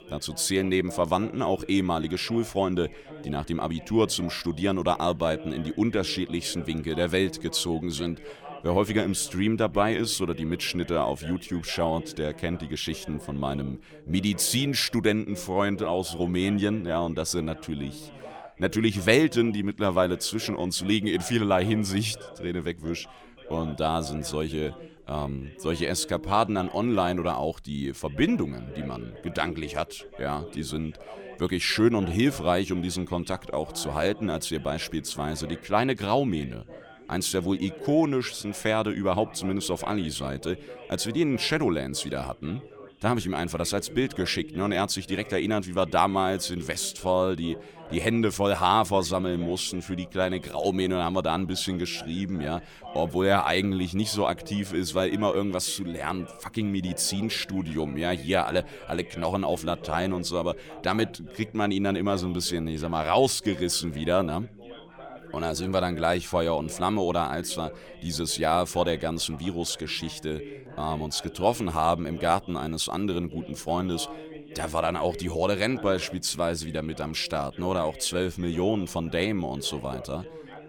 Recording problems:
background chatter; noticeable; throughout; 3 voices, 15 dB below the speech

